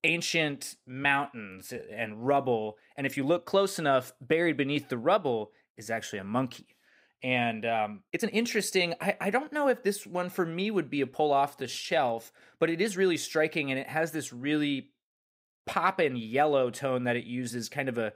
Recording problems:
uneven, jittery; strongly; from 1 to 16 s

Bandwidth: 15.5 kHz